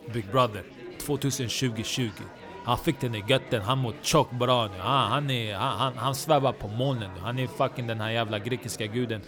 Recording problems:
chatter from many people; noticeable; throughout; 15 dB below the speech

